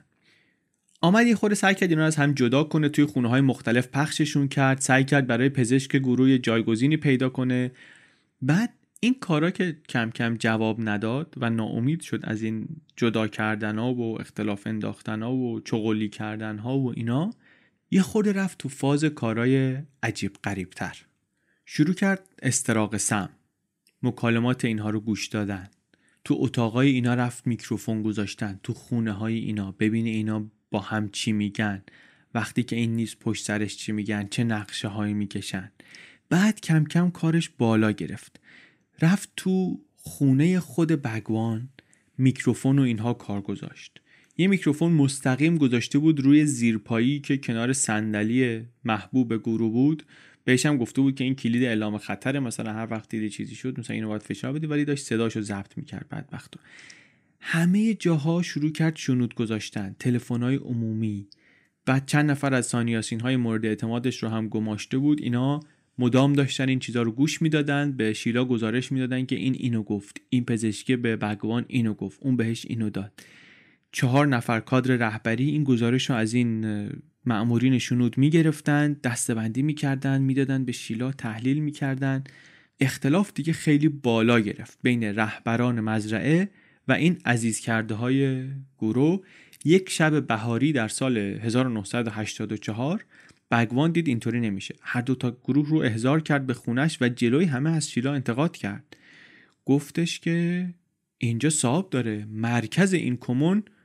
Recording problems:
none

